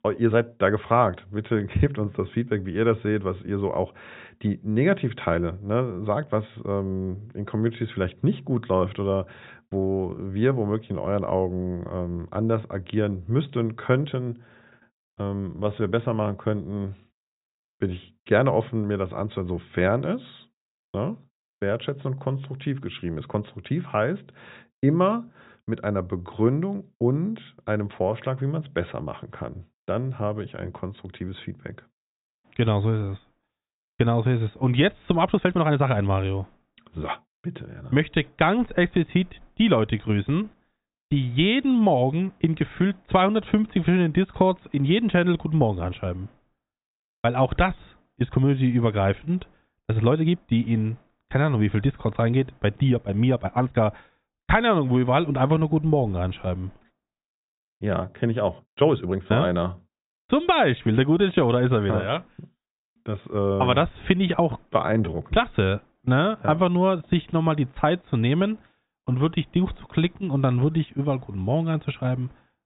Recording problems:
high frequencies cut off; severe; nothing above 4 kHz
uneven, jittery; strongly; from 14 s to 1:06

